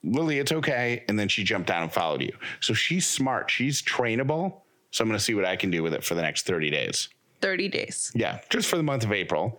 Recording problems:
squashed, flat; heavily

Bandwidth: 18 kHz